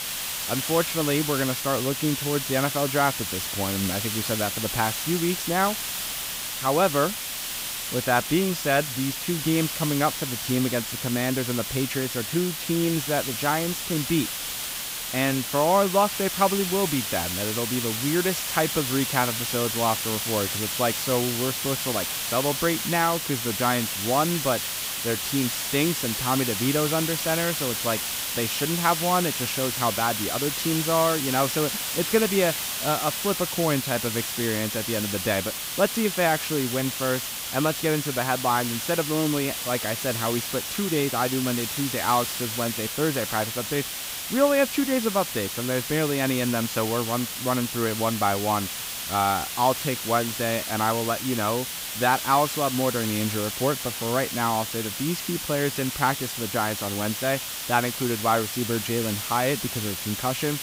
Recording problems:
hiss; loud; throughout; 2 dB below the speech

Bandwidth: 15.5 kHz